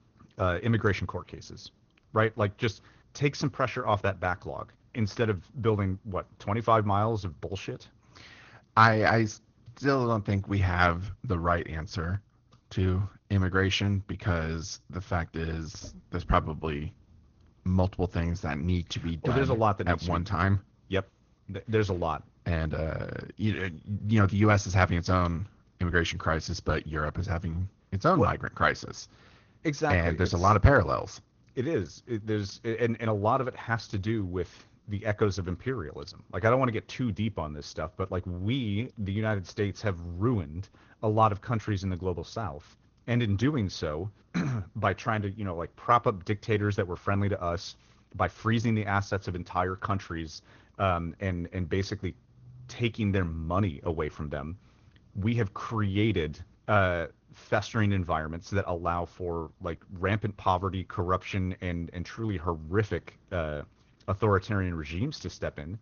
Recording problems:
high frequencies cut off; noticeable; nothing above 6.5 kHz
garbled, watery; slightly

